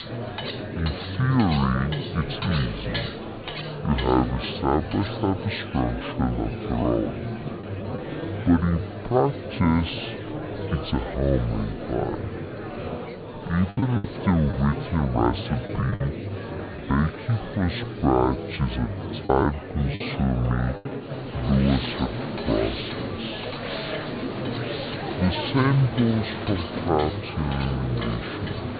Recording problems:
high frequencies cut off; severe; nothing above 4.5 kHz
wrong speed and pitch; too slow and too low; 0.6 times normal speed
murmuring crowd; loud; throughout; 7 dB below the speech
household noises; noticeable; throughout; 15 dB below the speech
choppy; very; from 14 to 17 s and at 19 s; 7% of the speech affected

